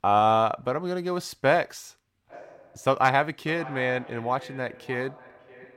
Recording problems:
echo of what is said; faint; from 2.5 s on; 590 ms later, 20 dB below the speech

